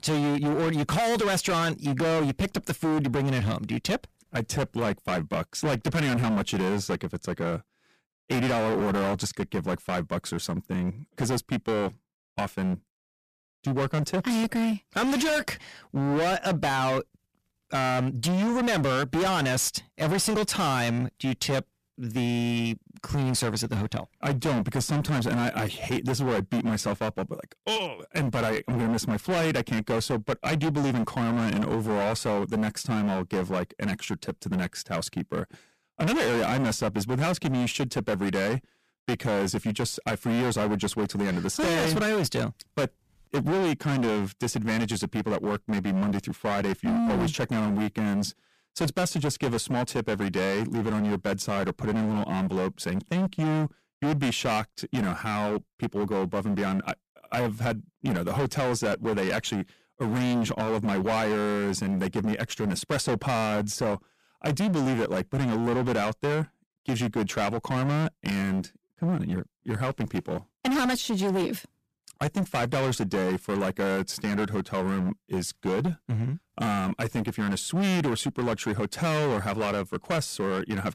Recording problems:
distortion; heavy; 24% of the sound clipped

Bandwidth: 14.5 kHz